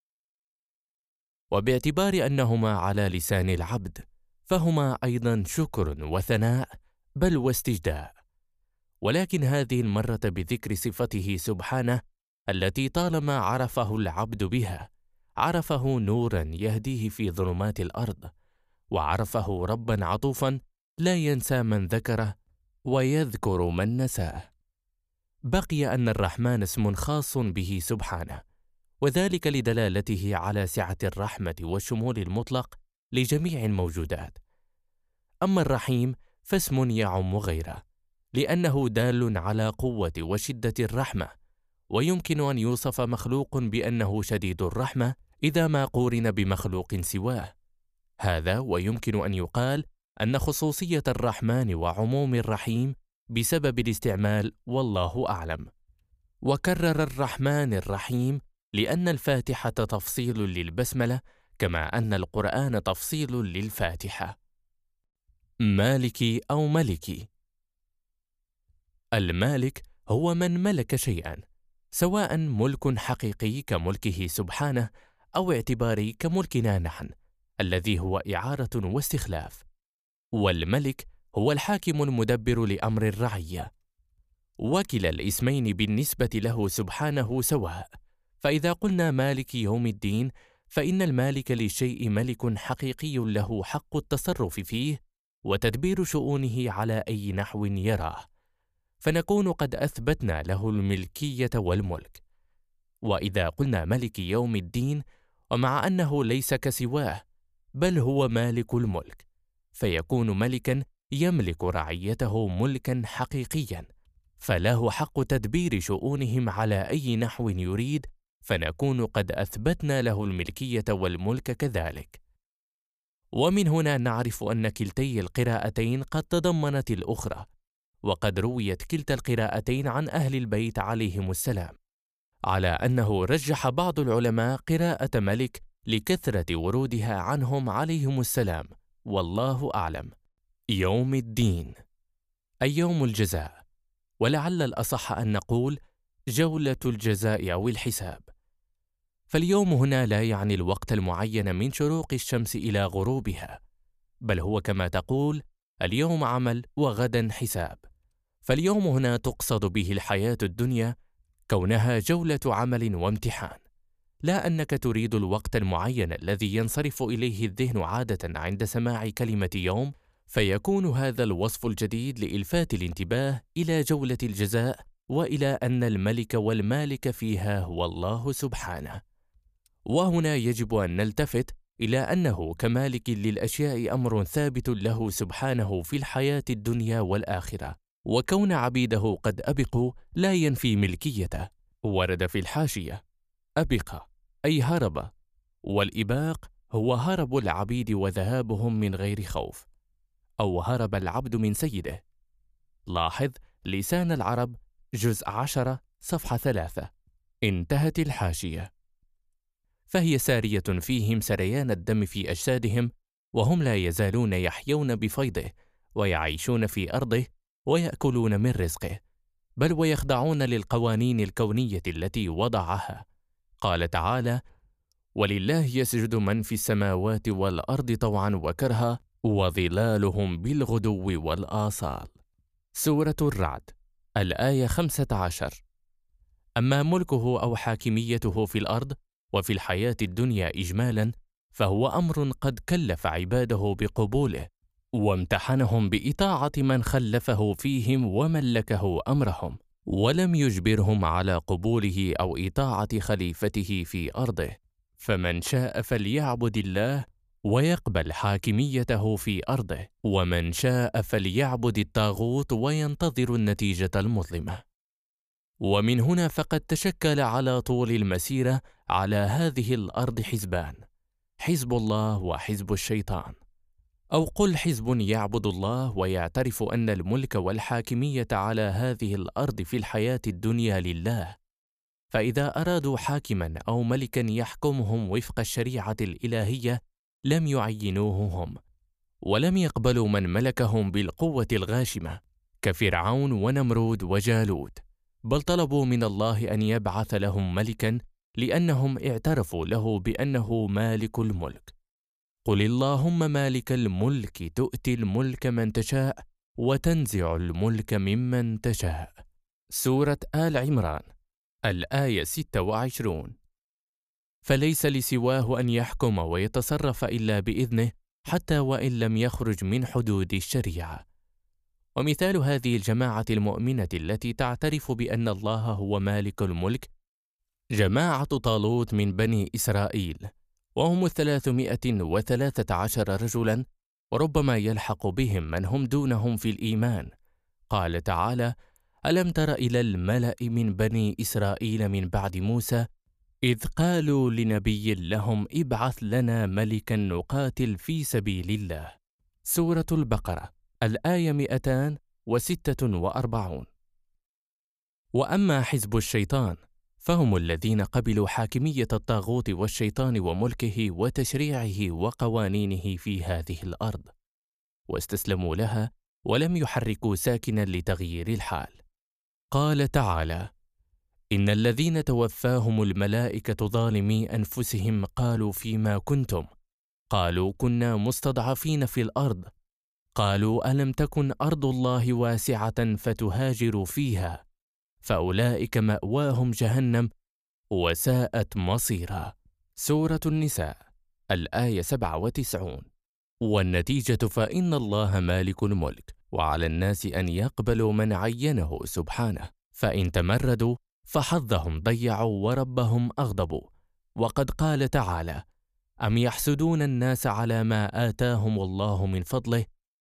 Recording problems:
uneven, jittery; strongly; from 1:00 to 5:44

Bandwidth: 14.5 kHz